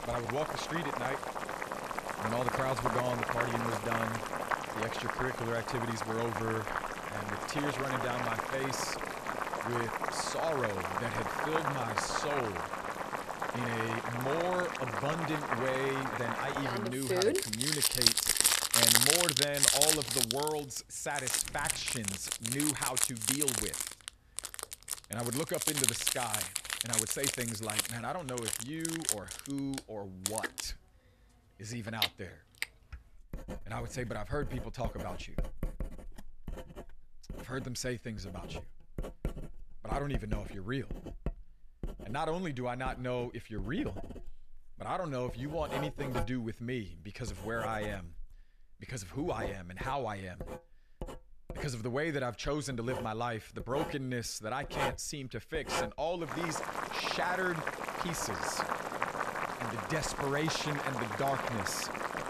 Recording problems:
household noises; very loud; throughout; 4 dB above the speech

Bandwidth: 14 kHz